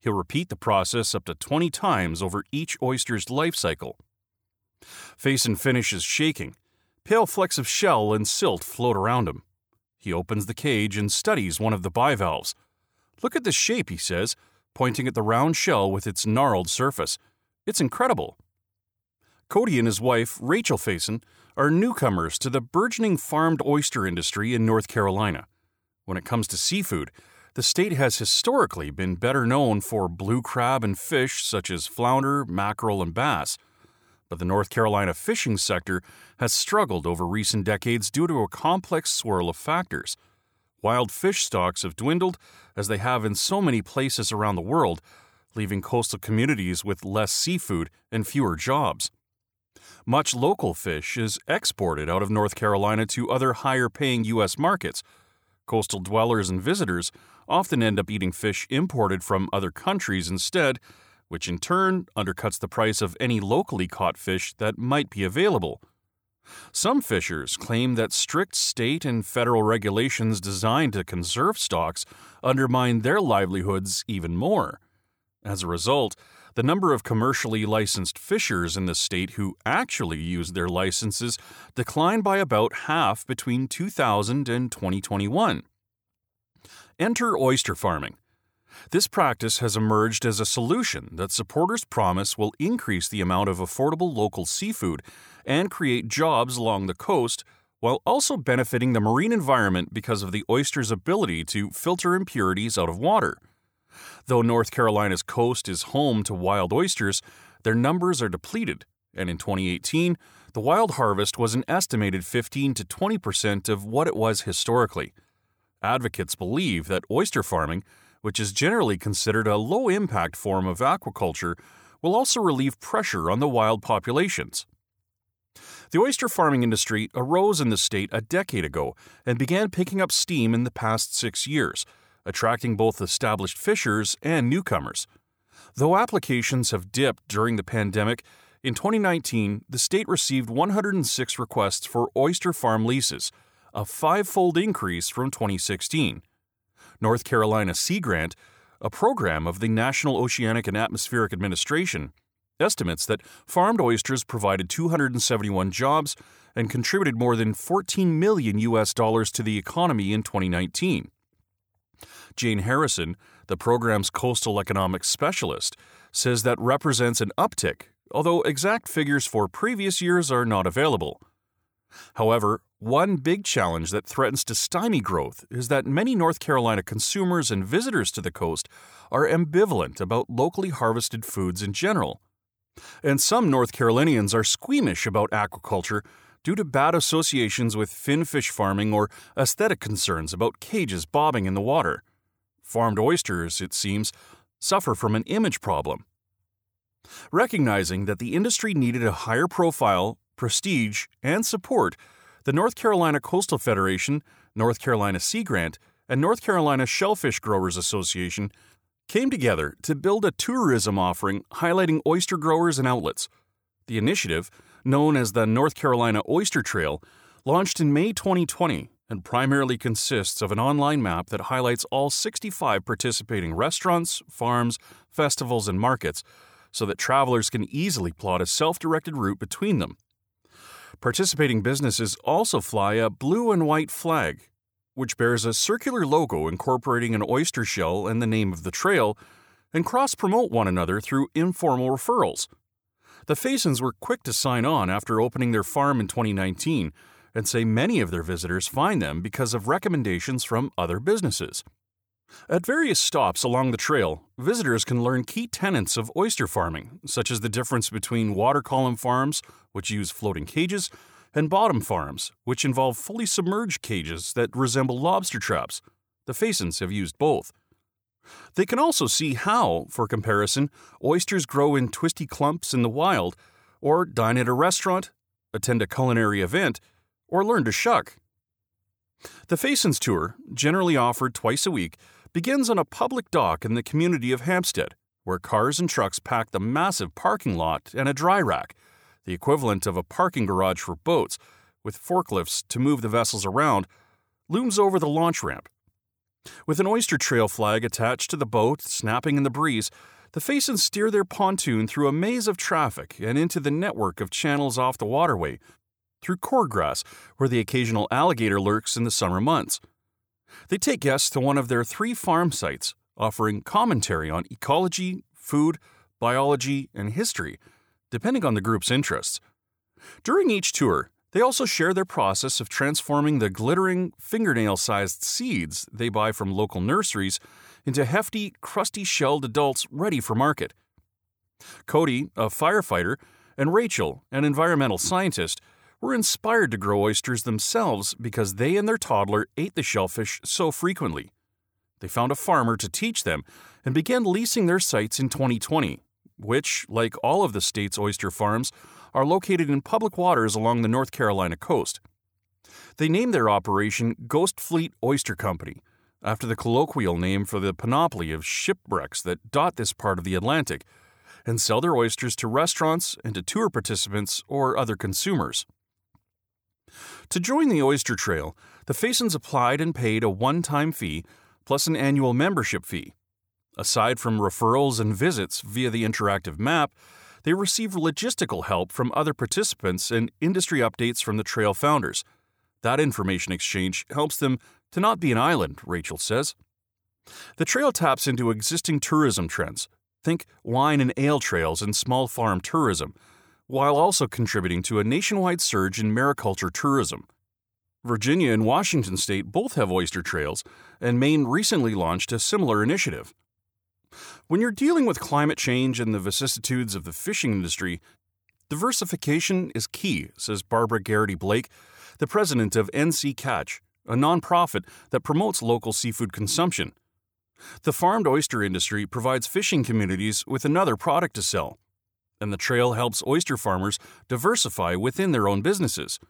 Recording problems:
none

